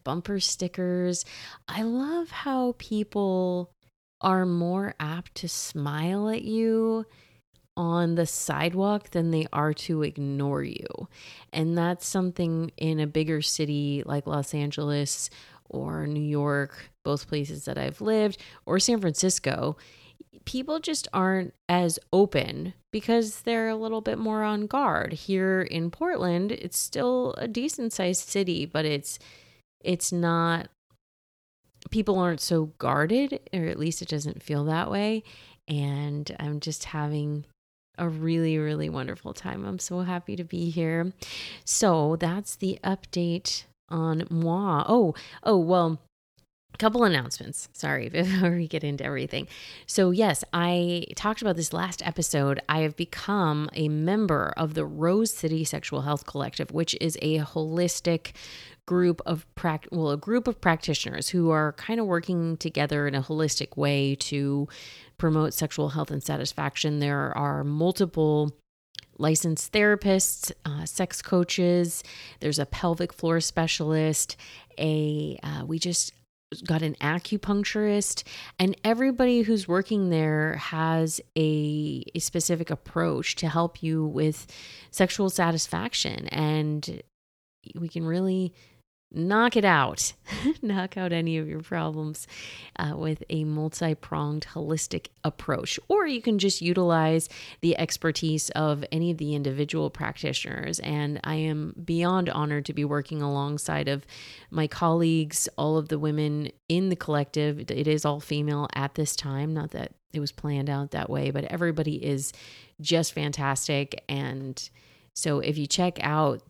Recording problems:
none

